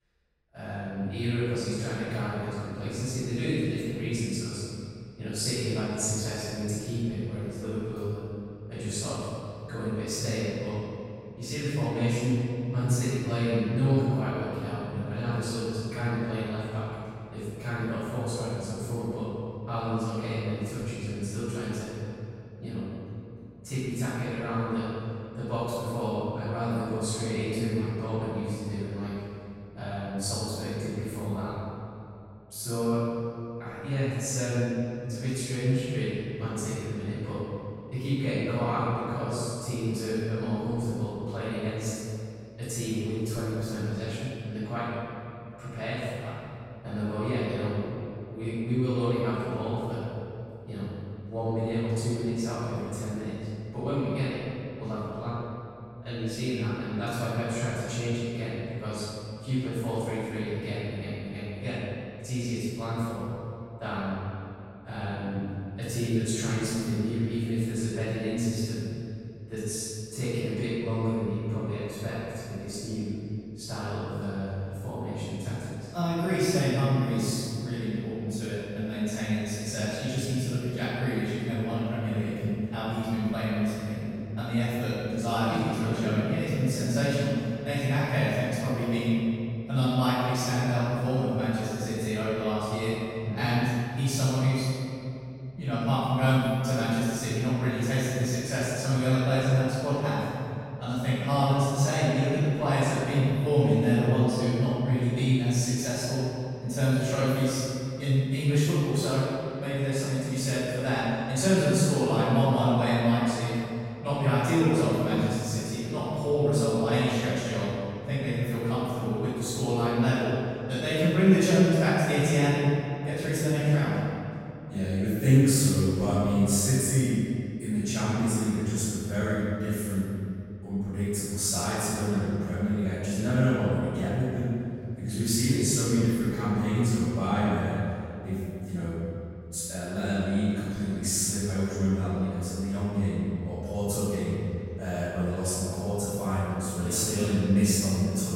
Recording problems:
room echo; strong; dies away in 2.6 s
off-mic speech; far

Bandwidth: 16 kHz